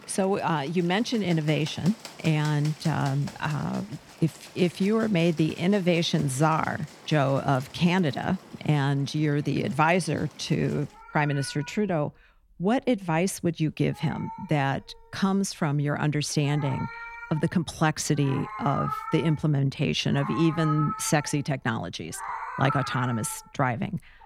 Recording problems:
animal sounds; noticeable; throughout; 15 dB below the speech

